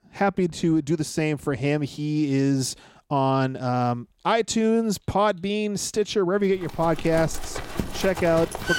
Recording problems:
animal sounds; noticeable; from 6.5 s on; 10 dB below the speech

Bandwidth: 16 kHz